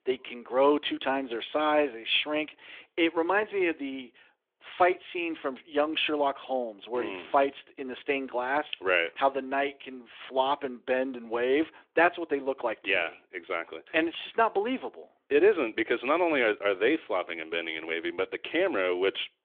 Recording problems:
phone-call audio; nothing above 3.5 kHz

